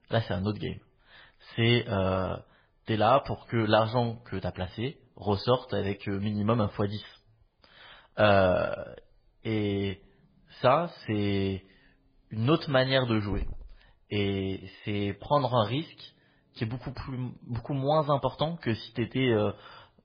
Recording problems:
garbled, watery; badly; nothing above 4 kHz
hiss; faint; throughout; 20 dB below the speech

